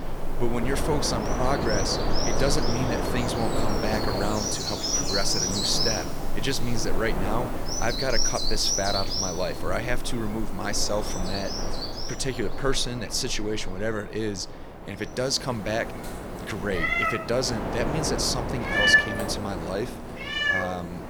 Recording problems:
animal sounds; very loud; throughout; 1 dB above the speech
wind noise on the microphone; heavy; 5 dB below the speech

